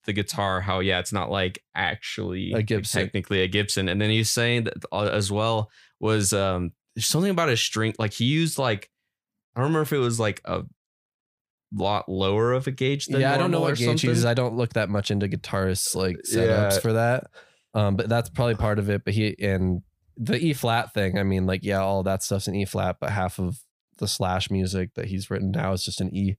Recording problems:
none

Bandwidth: 15 kHz